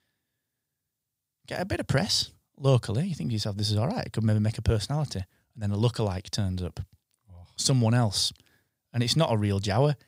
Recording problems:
none

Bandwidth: 15.5 kHz